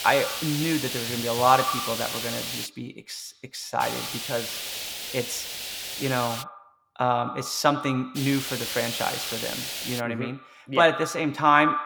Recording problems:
echo of what is said; strong; throughout; 90 ms later, 10 dB below the speech
hiss; loud; until 2.5 s, from 4 to 6.5 s and from 8 to 10 s; 4 dB below the speech

